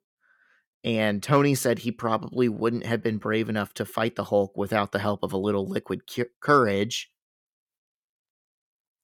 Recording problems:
none

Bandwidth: 18 kHz